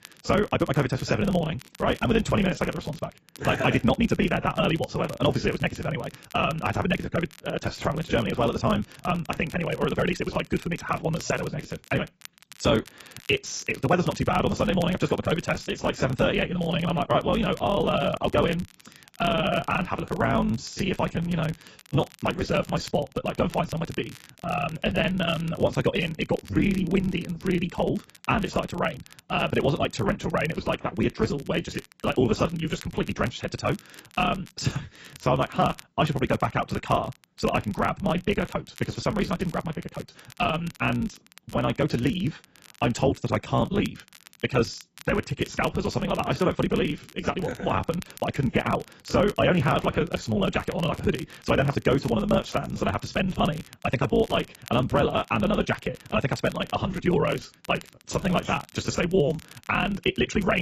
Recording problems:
garbled, watery; badly; nothing above 8 kHz
wrong speed, natural pitch; too fast; 1.6 times normal speed
crackle, like an old record; faint; 20 dB below the speech
abrupt cut into speech; at the end

